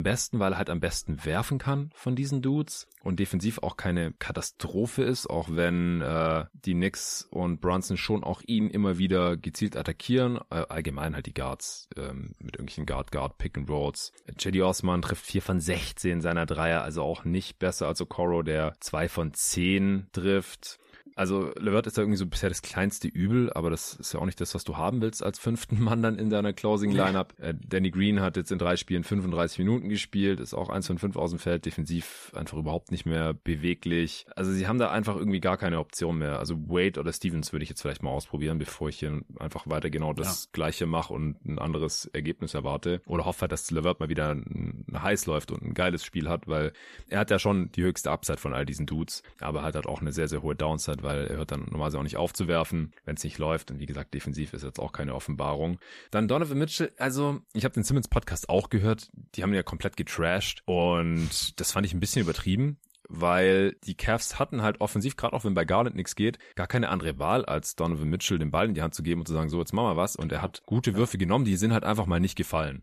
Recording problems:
abrupt cut into speech; at the start

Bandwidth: 14.5 kHz